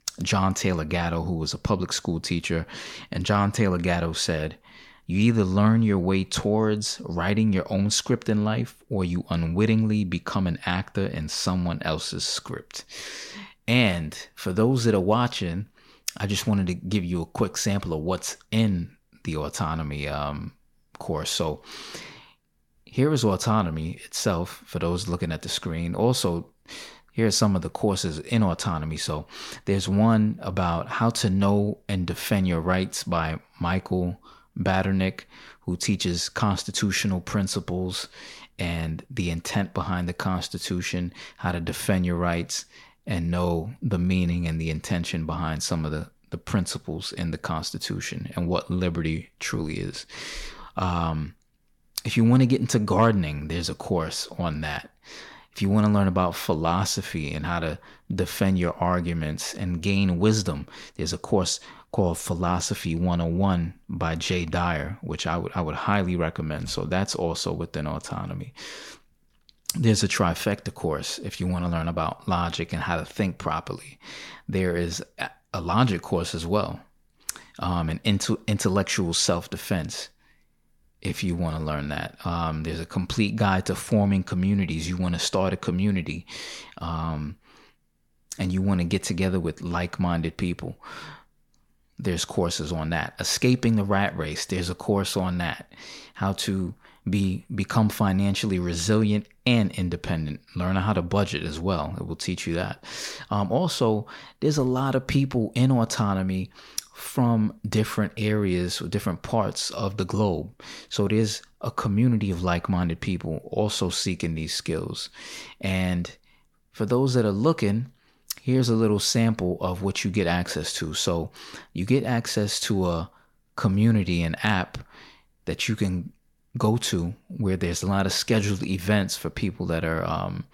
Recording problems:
none

